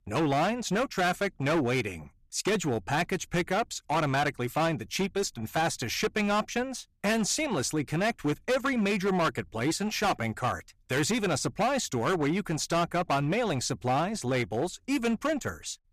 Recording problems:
distortion; heavy; 13% of the sound clipped

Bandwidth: 14.5 kHz